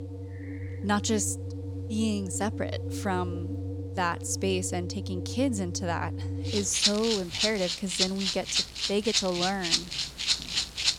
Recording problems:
background music; loud; throughout; as loud as the speech

